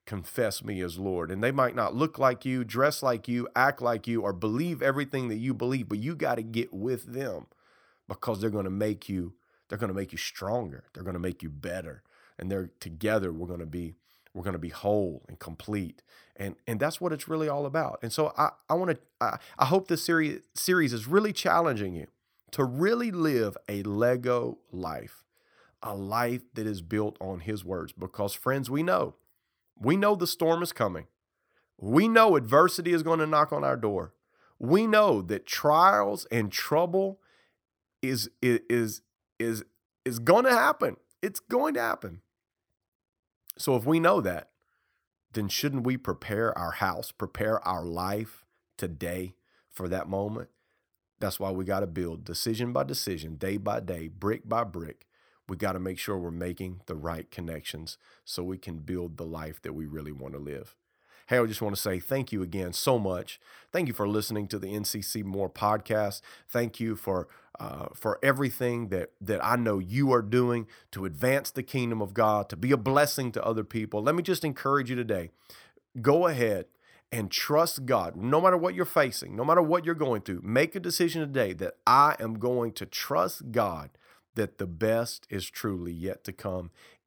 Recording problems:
none

